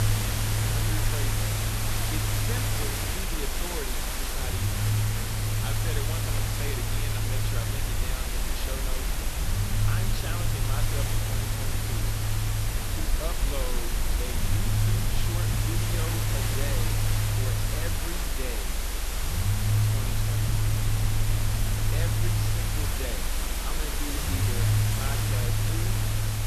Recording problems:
hiss; very loud; throughout; 9 dB above the speech
low rumble; loud; throughout; 2 dB below the speech

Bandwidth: 13.5 kHz